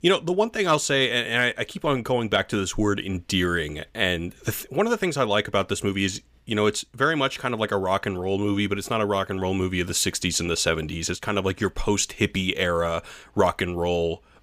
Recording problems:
none

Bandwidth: 15 kHz